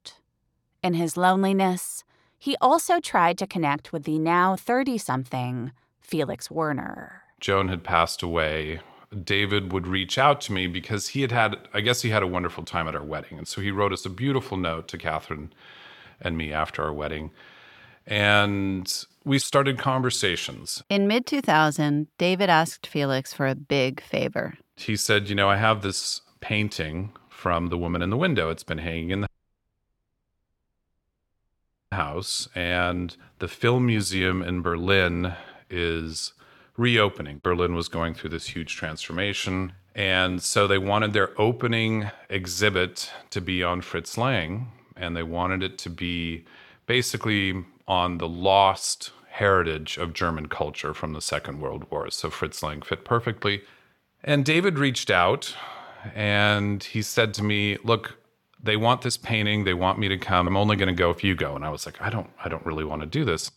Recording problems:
audio cutting out; at 29 s for 2.5 s

